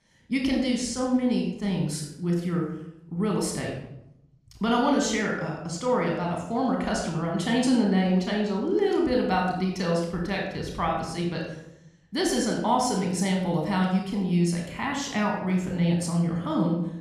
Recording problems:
room echo; noticeable; dies away in 0.7 s
off-mic speech; somewhat distant

